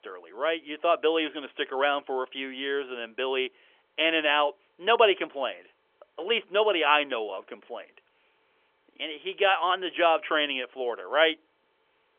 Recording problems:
phone-call audio; nothing above 3.5 kHz

